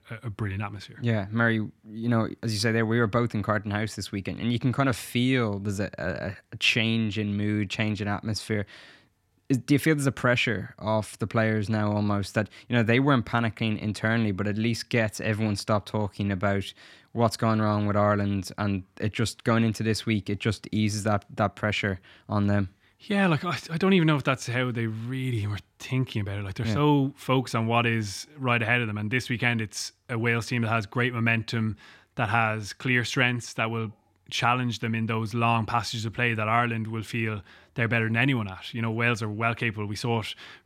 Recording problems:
none

